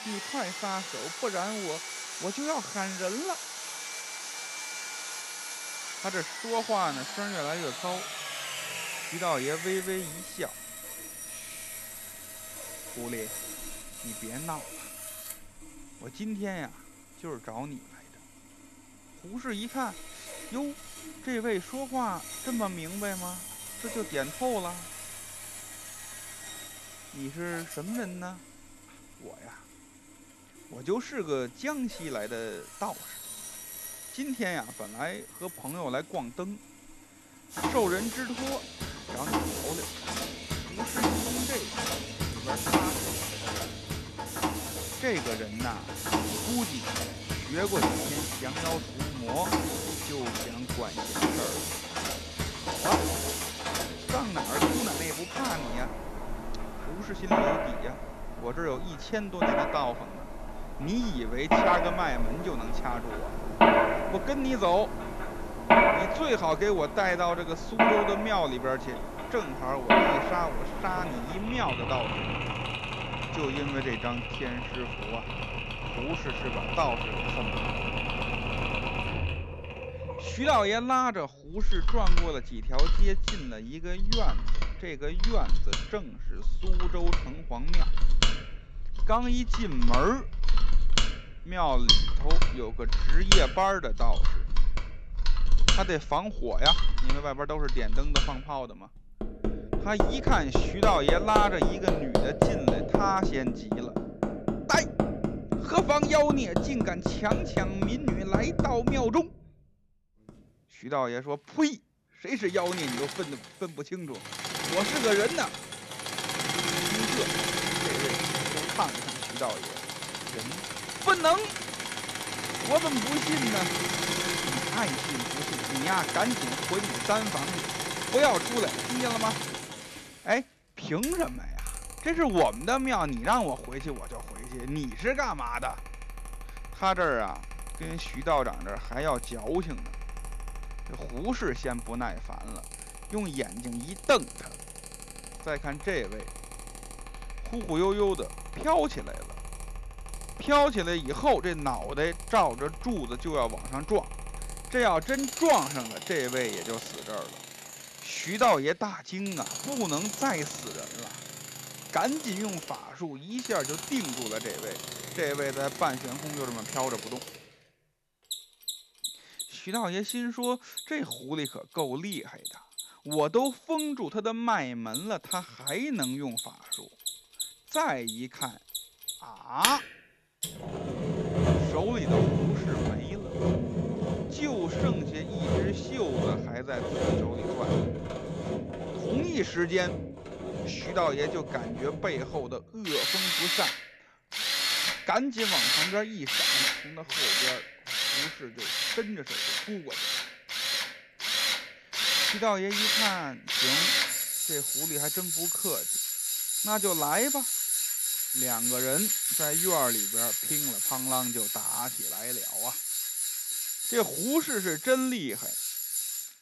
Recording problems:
machinery noise; very loud; throughout; 1 dB above the speech

